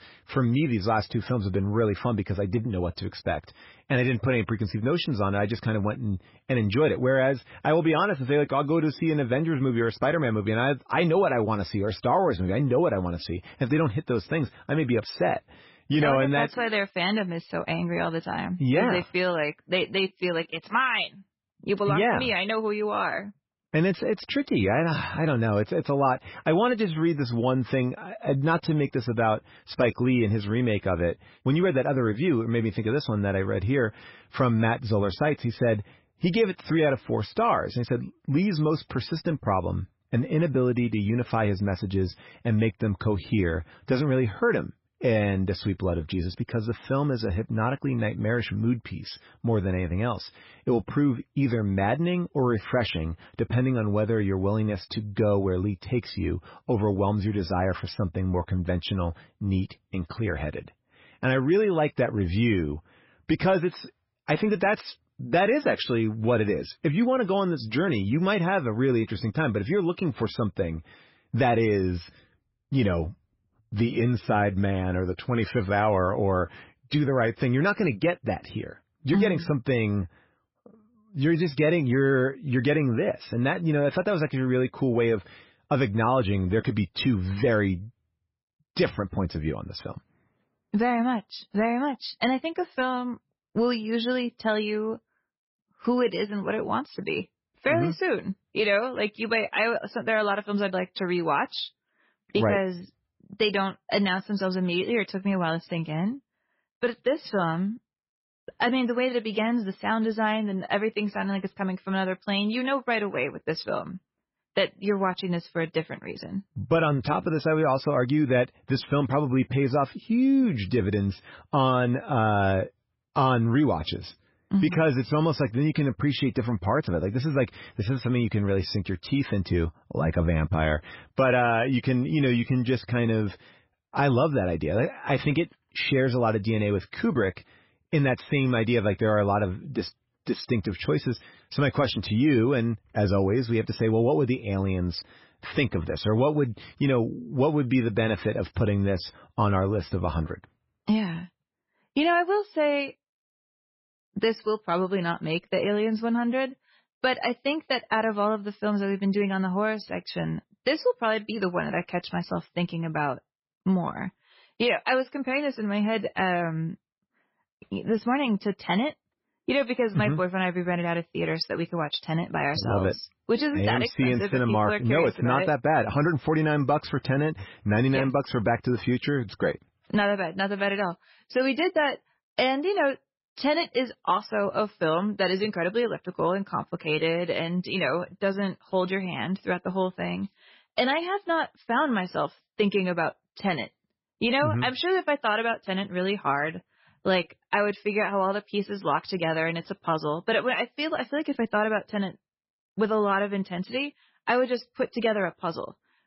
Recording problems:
garbled, watery; badly; nothing above 5.5 kHz

